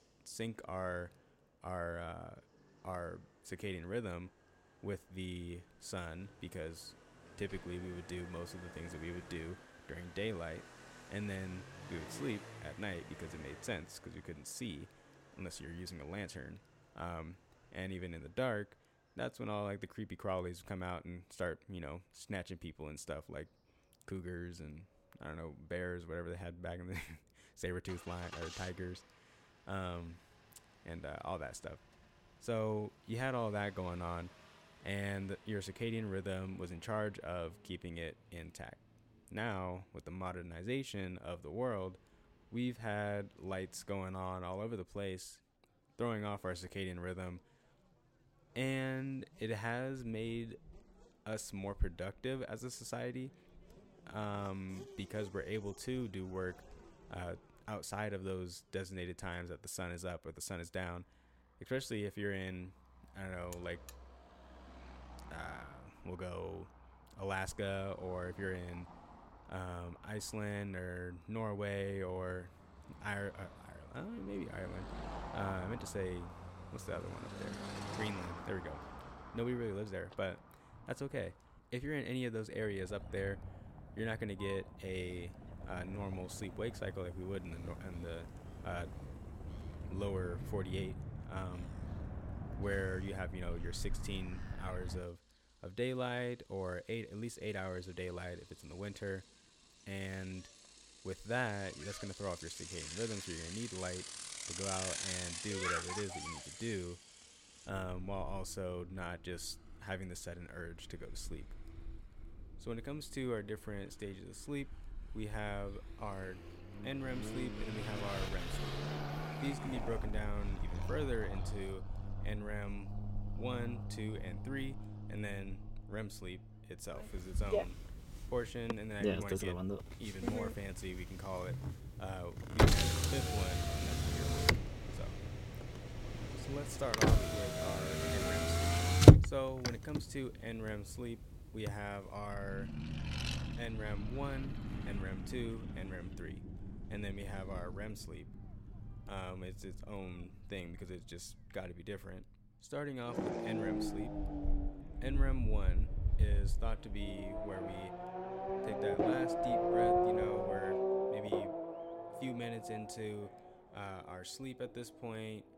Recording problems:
traffic noise; very loud; throughout; 5 dB above the speech
alarm; faint; at 1:04; peak 10 dB below the speech

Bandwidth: 16.5 kHz